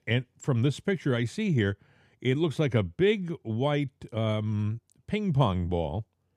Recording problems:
none

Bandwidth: 14.5 kHz